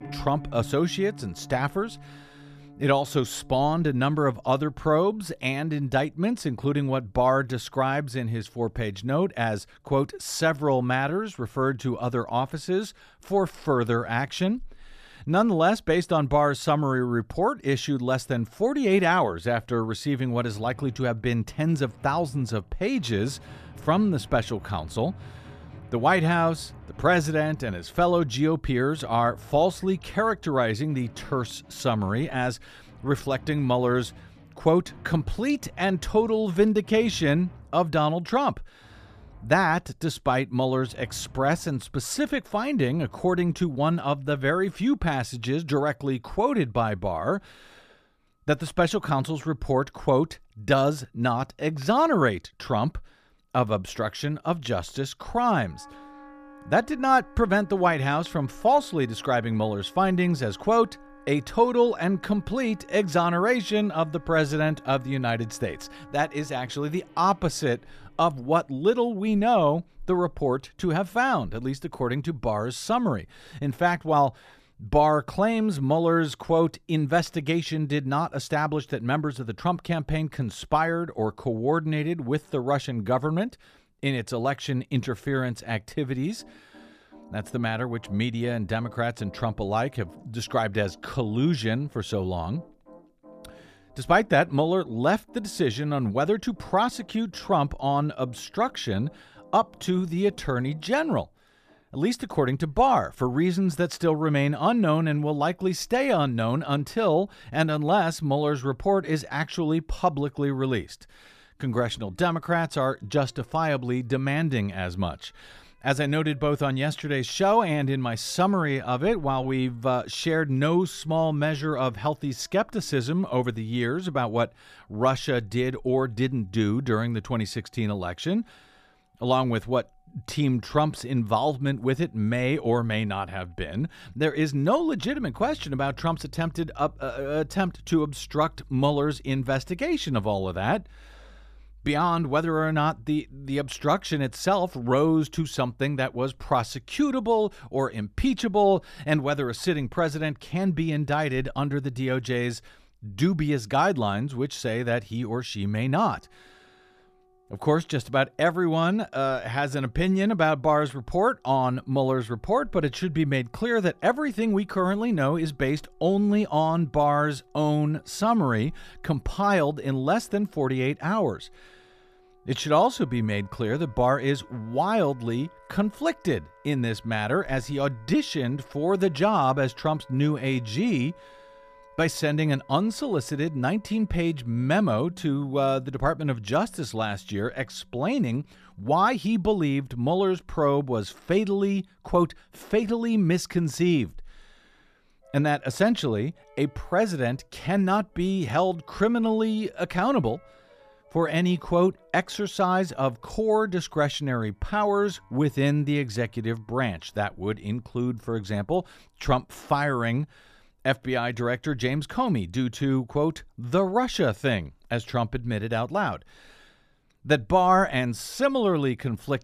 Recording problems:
background music; faint; throughout; 25 dB below the speech

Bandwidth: 14.5 kHz